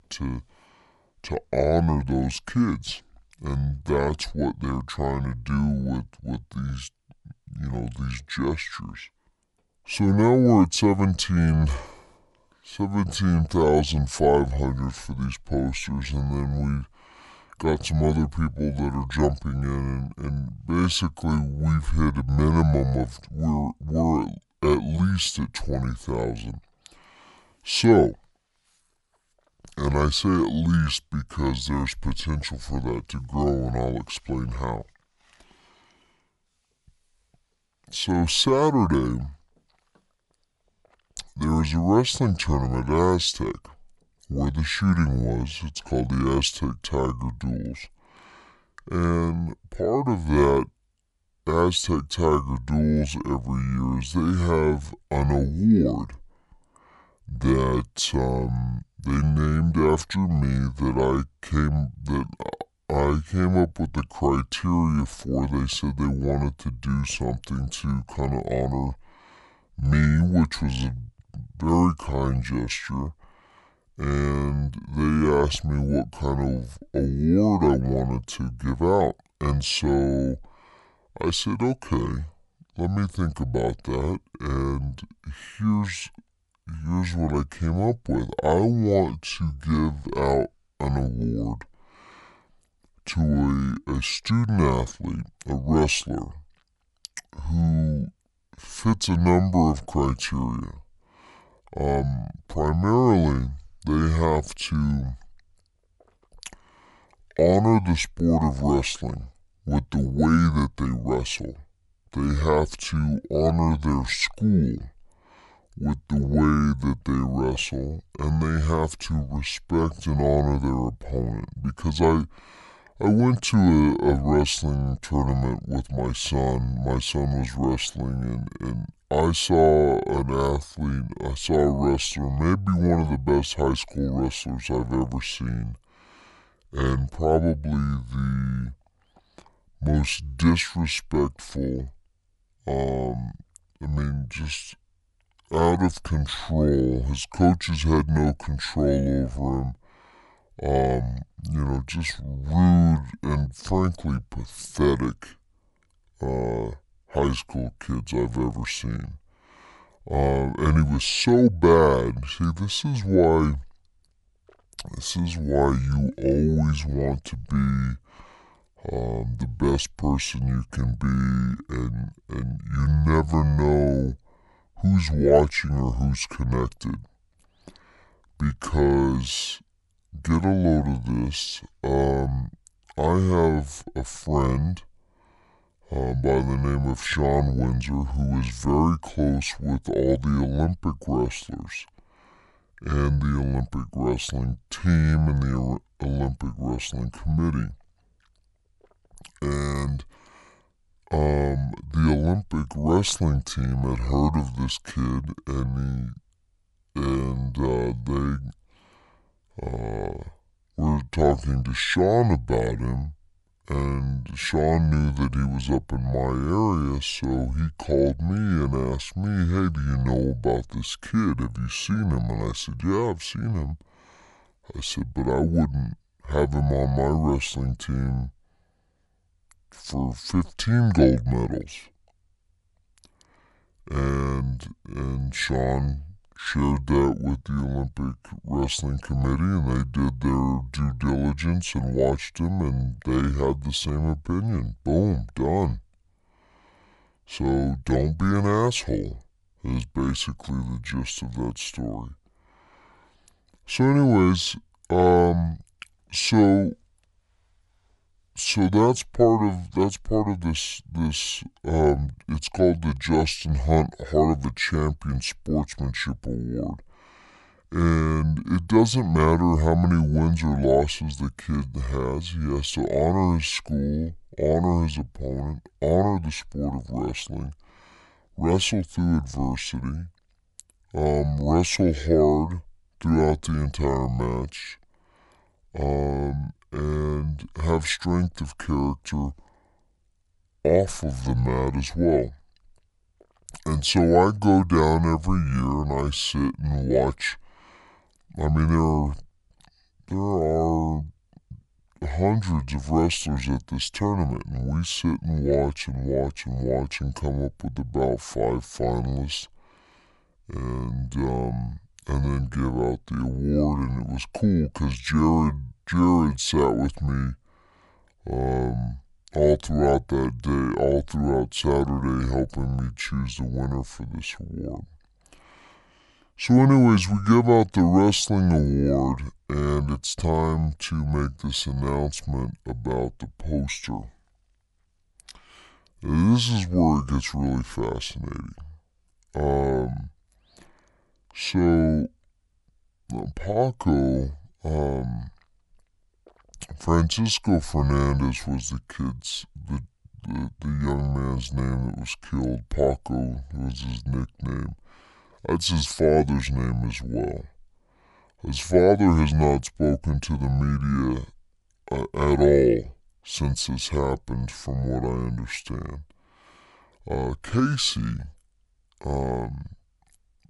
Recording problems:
wrong speed and pitch; too slow and too low; 0.6 times normal speed

